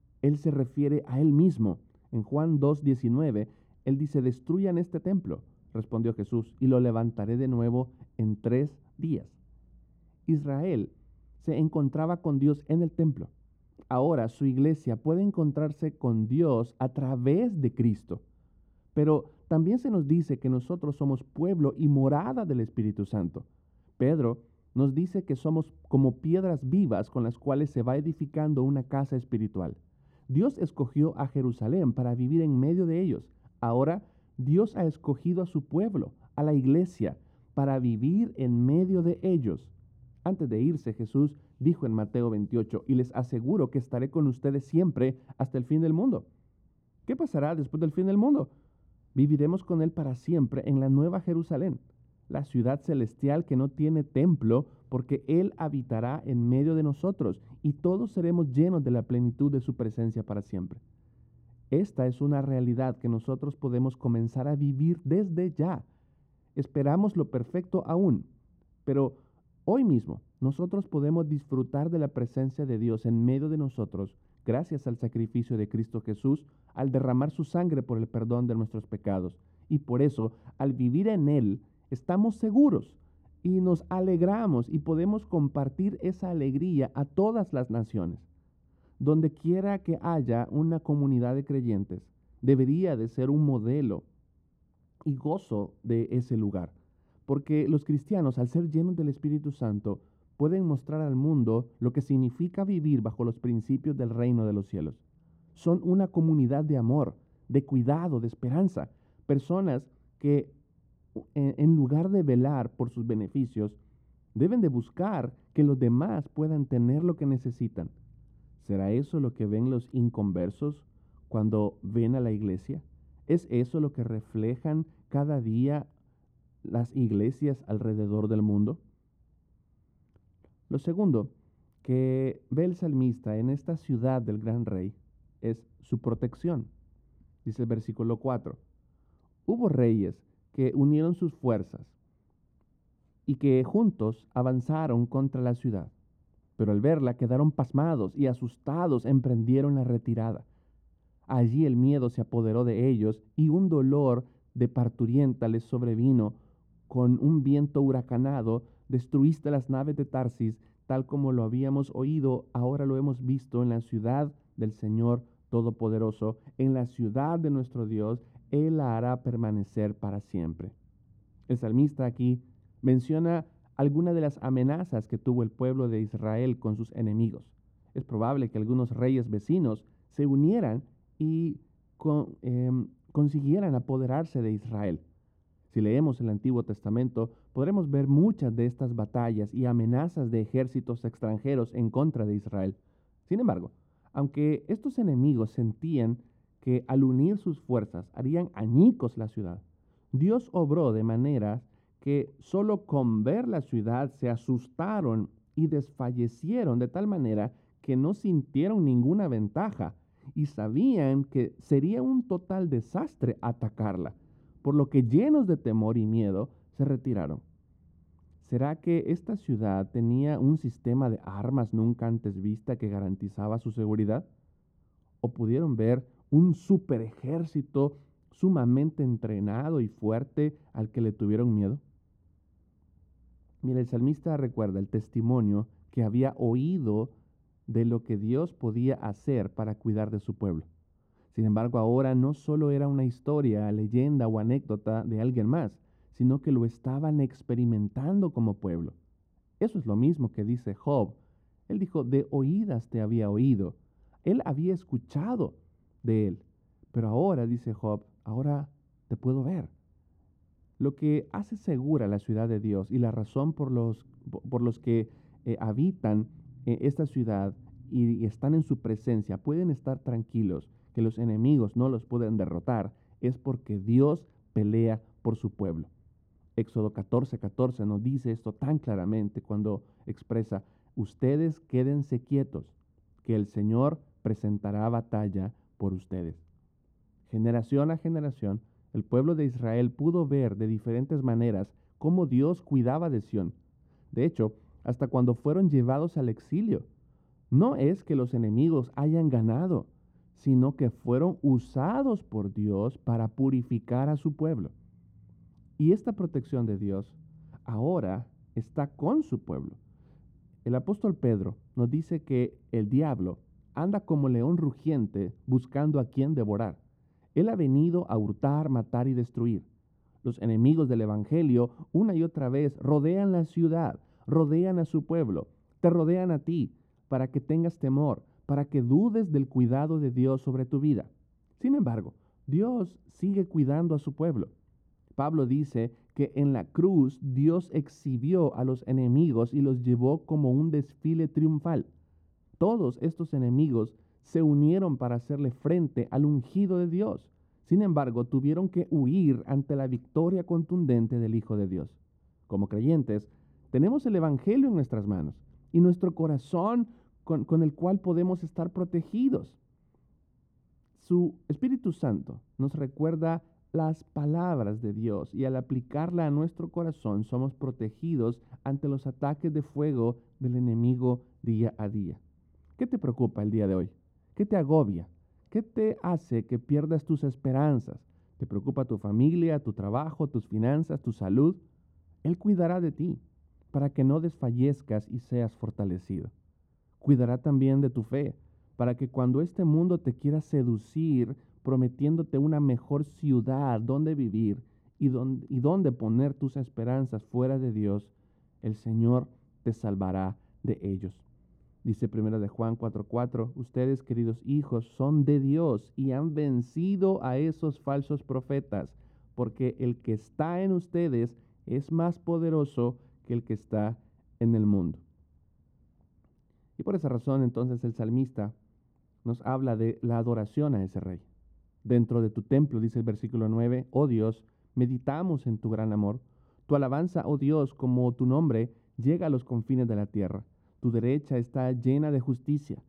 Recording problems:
muffled; very; fading above 1 kHz

